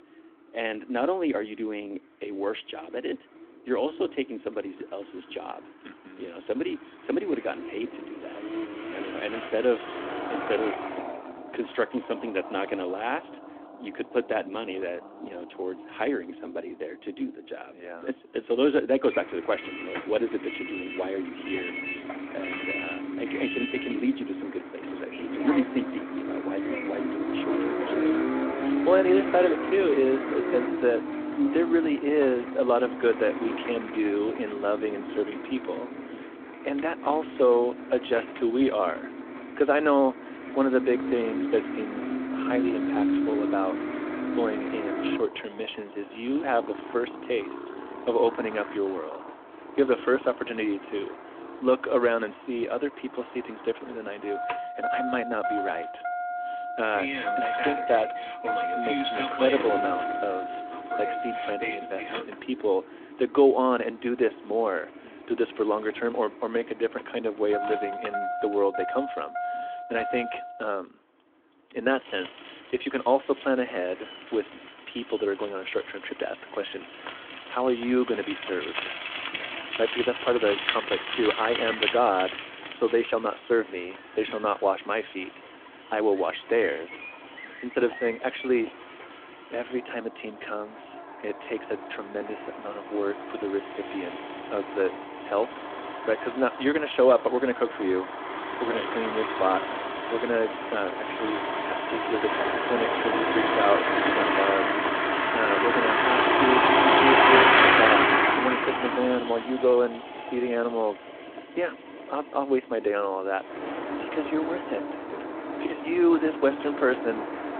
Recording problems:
phone-call audio
traffic noise; loud; throughout; as loud as the speech

